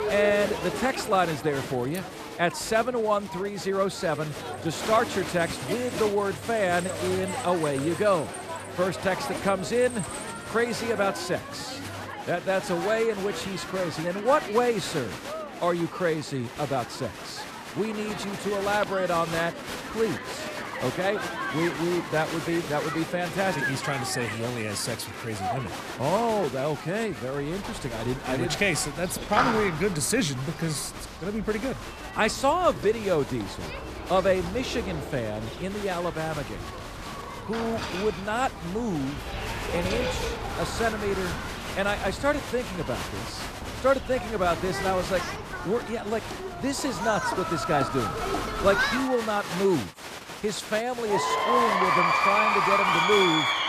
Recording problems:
crowd noise; loud; throughout; 4 dB below the speech

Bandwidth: 14.5 kHz